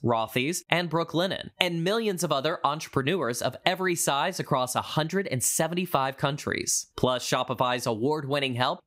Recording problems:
squashed, flat; somewhat

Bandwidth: 15.5 kHz